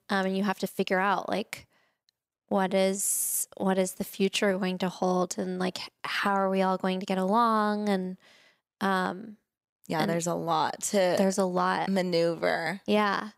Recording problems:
uneven, jittery; strongly; from 0.5 to 12 s

